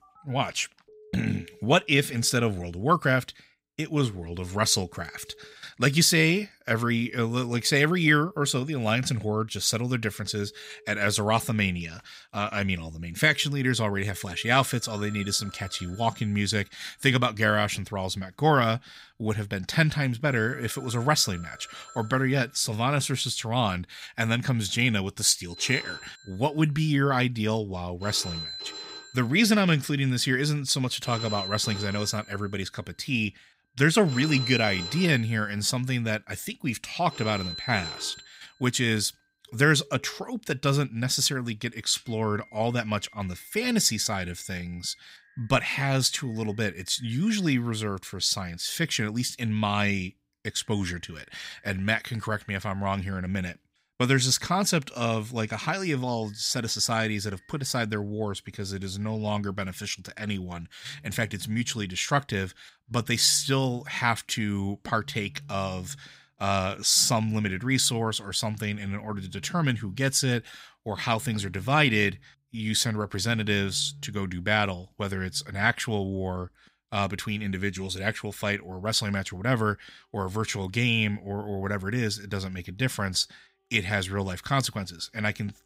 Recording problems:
alarms or sirens; noticeable; throughout; 15 dB below the speech

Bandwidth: 15.5 kHz